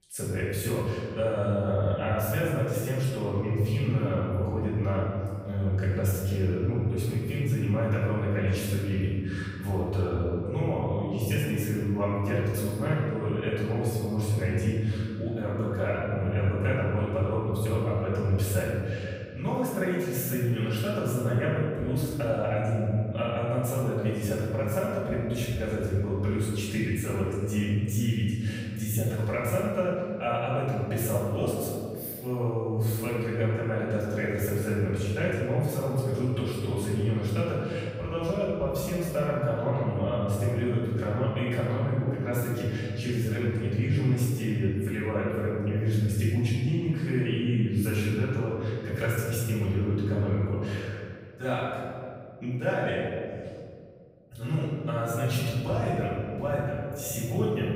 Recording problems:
room echo; strong; dies away in 2.1 s
off-mic speech; far

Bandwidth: 15.5 kHz